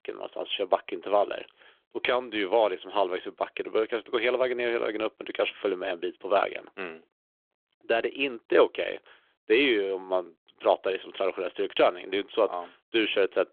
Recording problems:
phone-call audio

